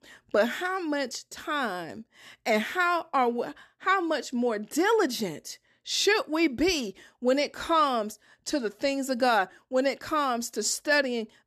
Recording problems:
none

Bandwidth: 13.5 kHz